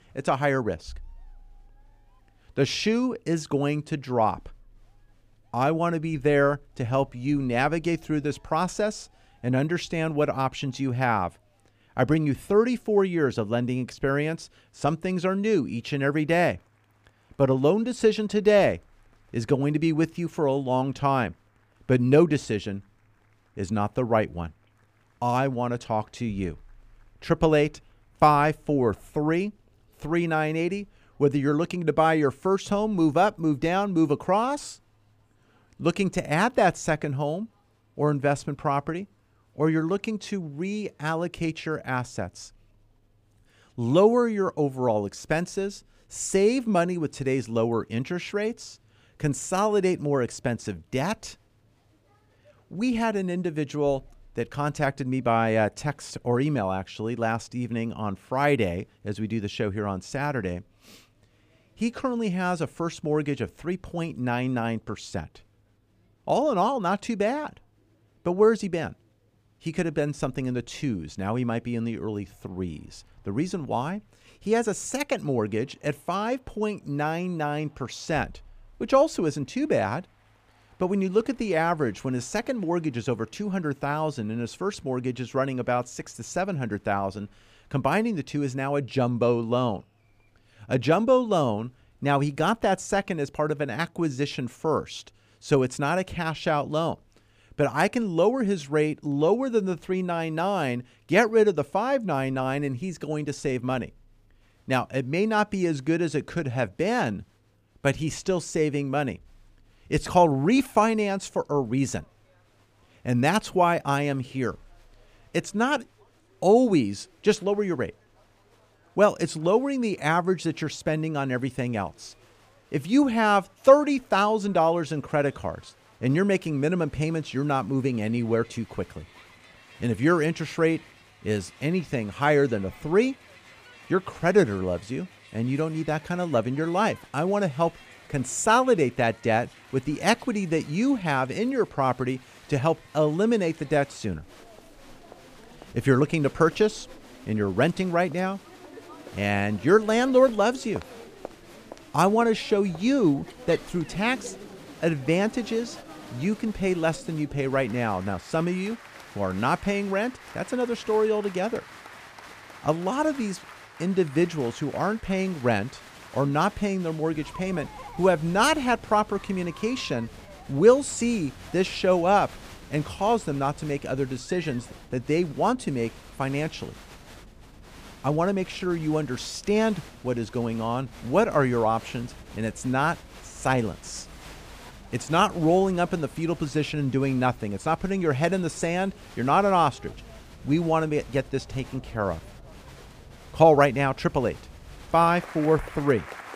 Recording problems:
crowd noise; faint; throughout; 20 dB below the speech

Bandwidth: 15 kHz